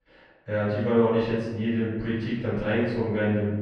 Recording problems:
room echo; strong; dies away in 1.1 s
off-mic speech; far
muffled; slightly; fading above 2.5 kHz

